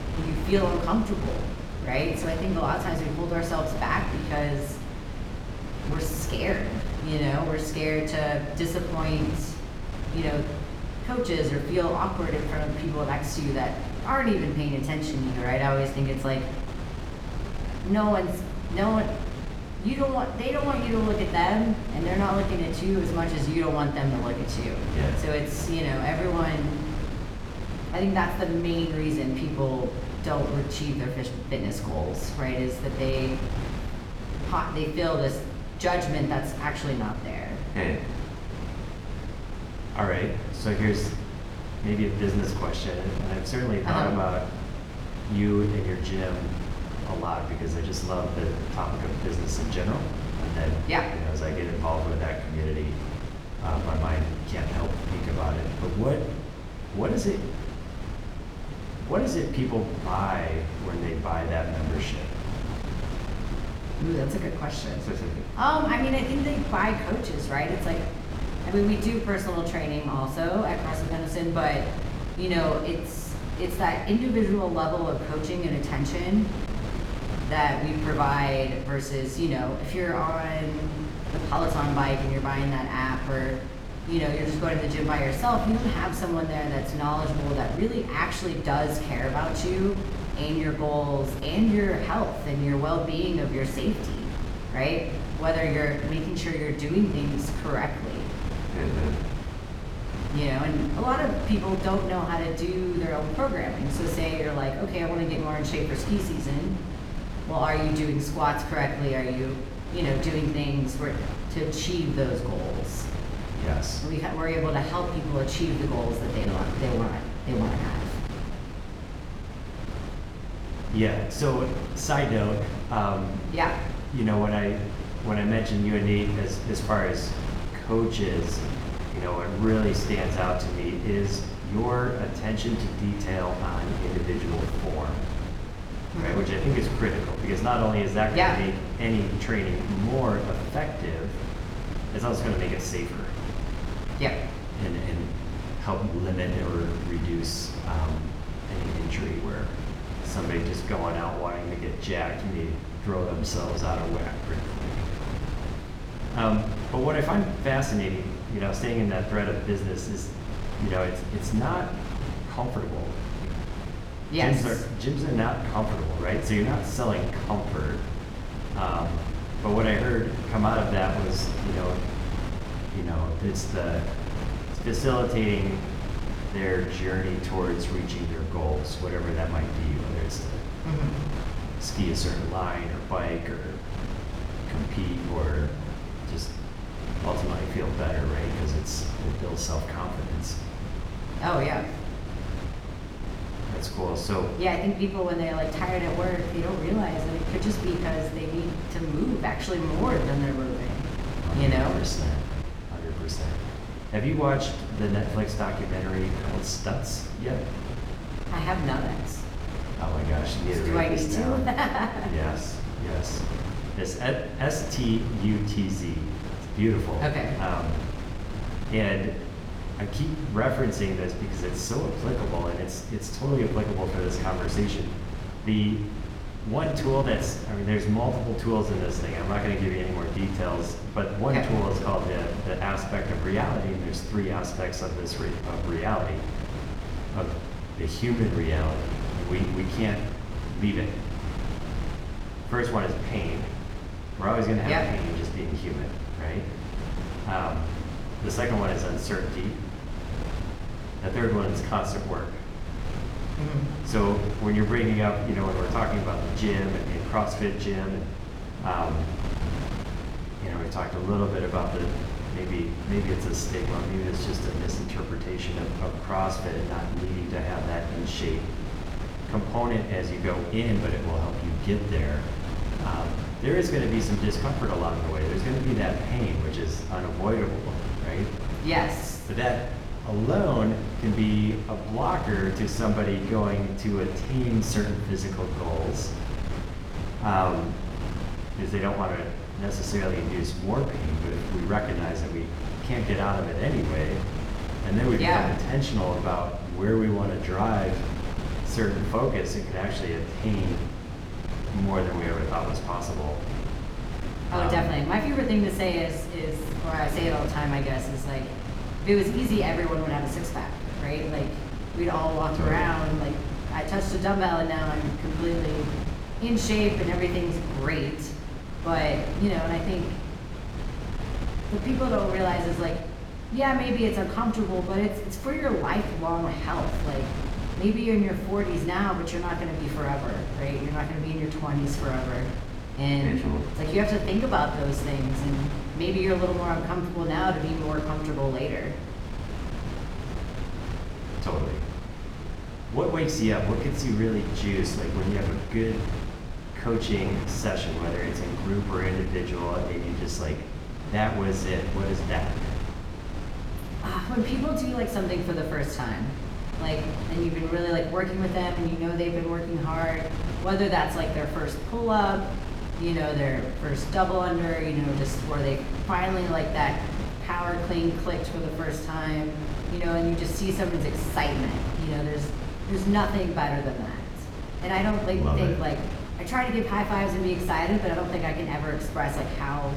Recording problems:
room echo; slight; dies away in 0.7 s
off-mic speech; somewhat distant
wind noise on the microphone; heavy; 10 dB below the speech

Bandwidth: 18 kHz